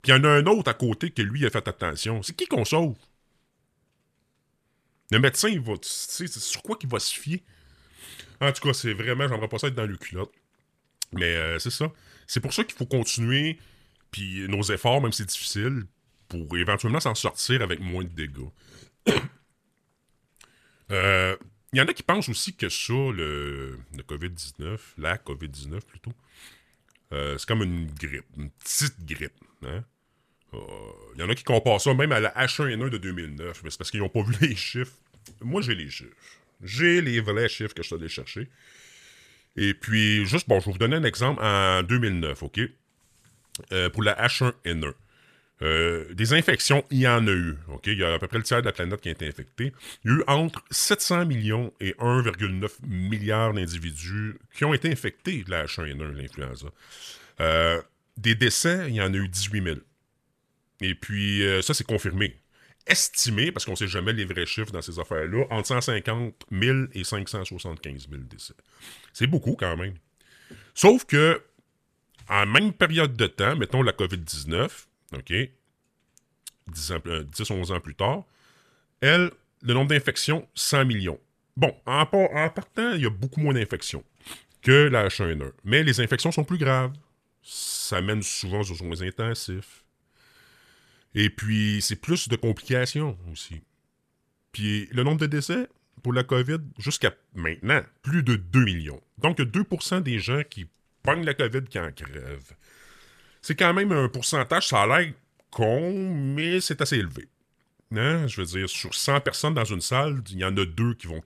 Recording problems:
none

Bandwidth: 14.5 kHz